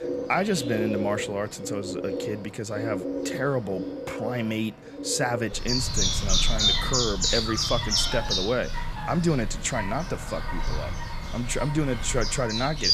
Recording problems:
animal sounds; very loud; throughout; as loud as the speech

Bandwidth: 14.5 kHz